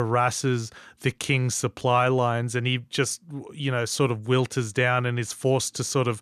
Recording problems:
abrupt cut into speech; at the start

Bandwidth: 14.5 kHz